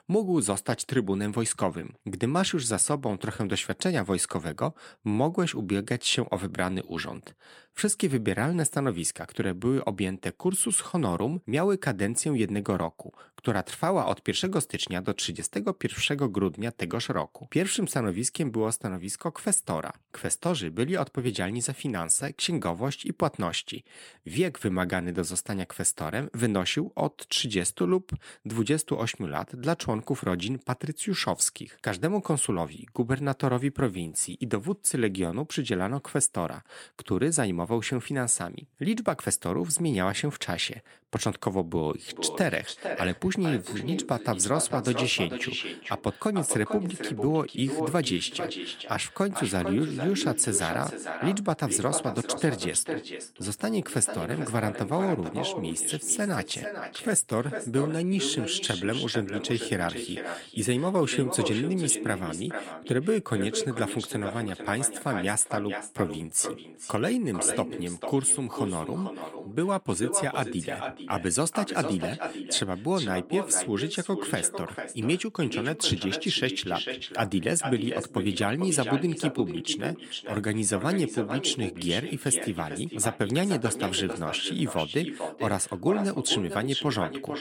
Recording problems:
echo of what is said; strong; from 42 s on; 450 ms later, 8 dB below the speech

